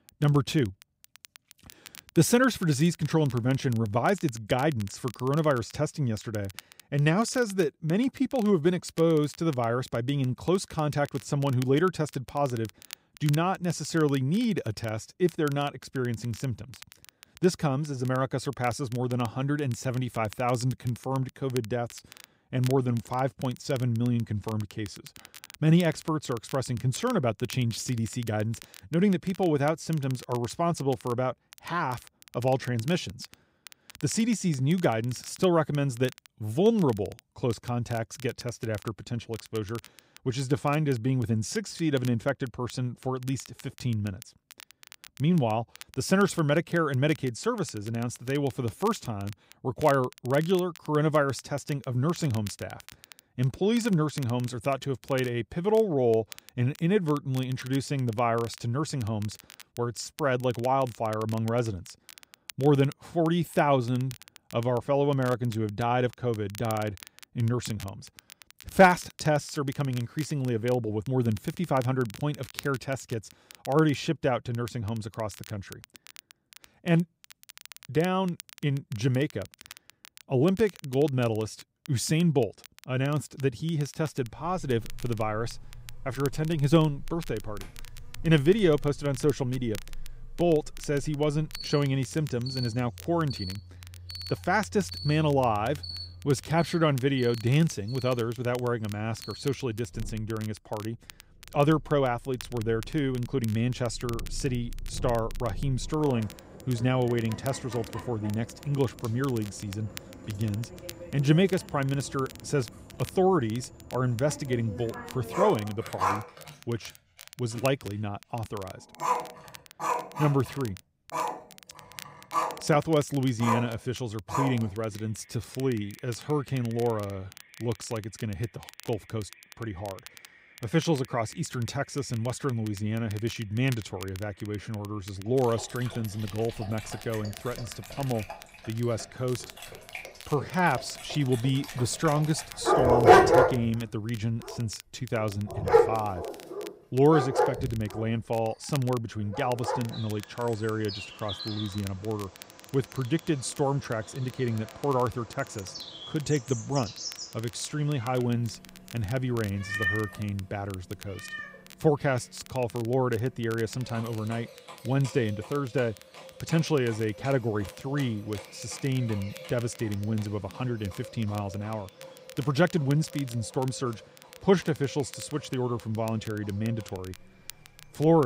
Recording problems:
animal sounds; loud; from 1:24 on; 4 dB below the speech
crackle, like an old record; faint; 20 dB below the speech
abrupt cut into speech; at the end

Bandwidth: 15.5 kHz